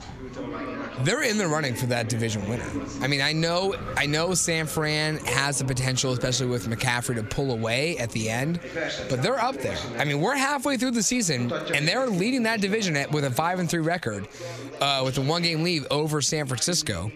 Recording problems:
squashed, flat; somewhat, background pumping
background chatter; noticeable; throughout; 3 voices, 15 dB below the speech
wind in the background; faint; throughout; 20 dB below the speech

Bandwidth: 14.5 kHz